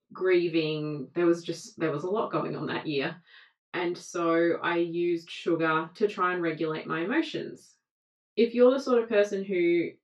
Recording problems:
off-mic speech; far
room echo; slight; dies away in 0.2 s

